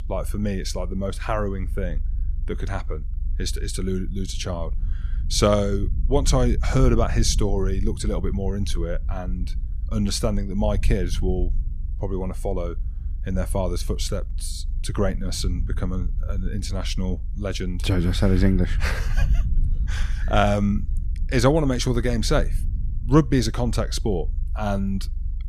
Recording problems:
low rumble; faint; throughout; 20 dB below the speech

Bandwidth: 14.5 kHz